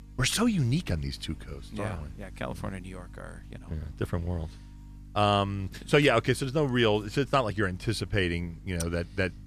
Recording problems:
electrical hum; faint; throughout; 50 Hz, 30 dB below the speech

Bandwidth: 14.5 kHz